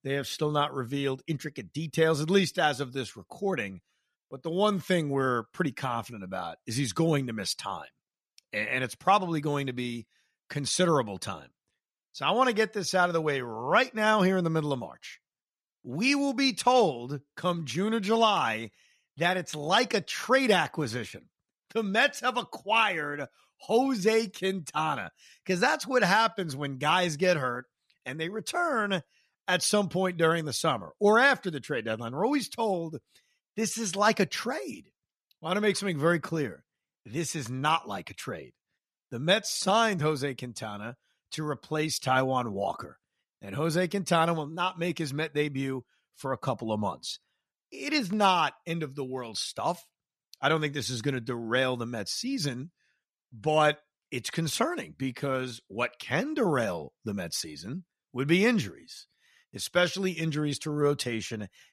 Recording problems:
none

